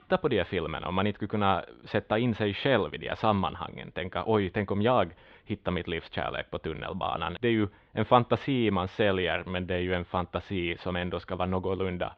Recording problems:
muffled; very; fading above 3.5 kHz

